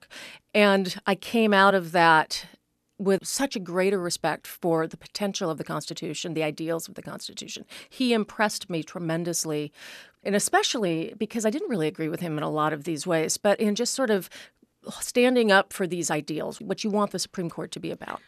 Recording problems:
none

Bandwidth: 13.5 kHz